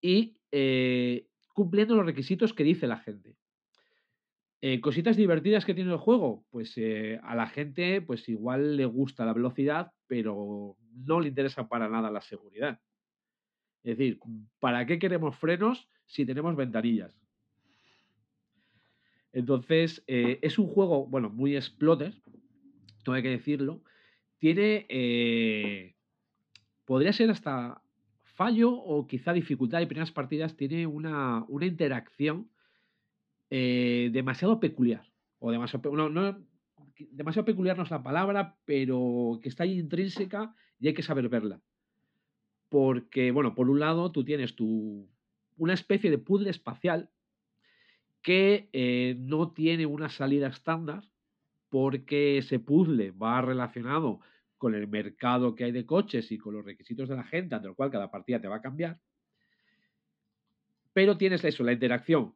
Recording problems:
muffled; slightly; fading above 3.5 kHz

